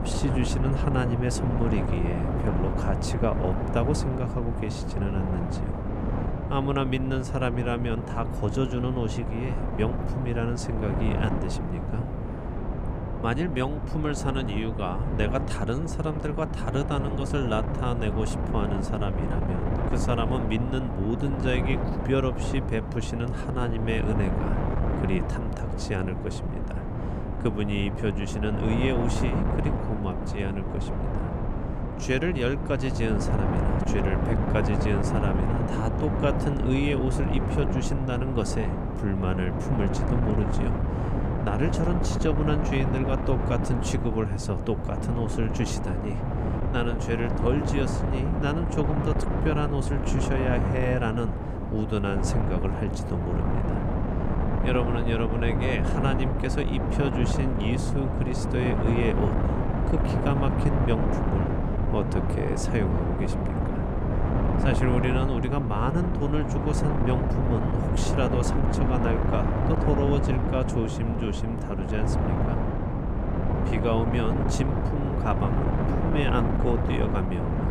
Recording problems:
wind noise on the microphone; heavy; 1 dB below the speech

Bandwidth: 14.5 kHz